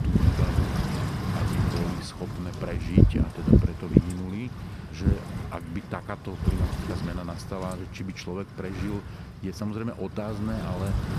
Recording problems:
wind noise on the microphone; heavy; 3 dB above the speech

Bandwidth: 14.5 kHz